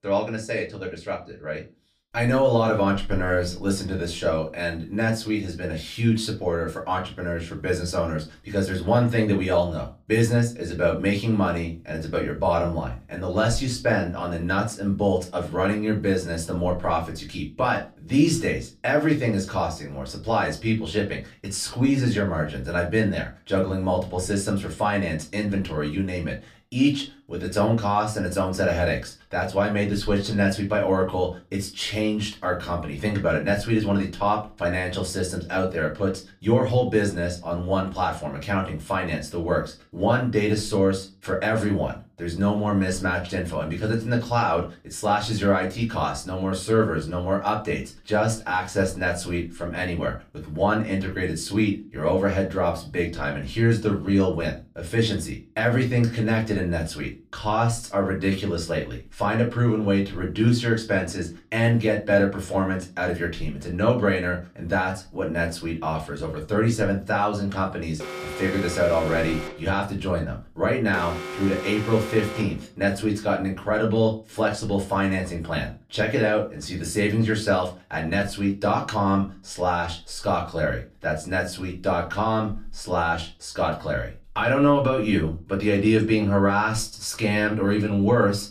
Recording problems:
off-mic speech; far
room echo; very slight; dies away in 0.2 s
alarm; noticeable; from 1:08 to 1:13; peak 8 dB below the speech

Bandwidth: 14.5 kHz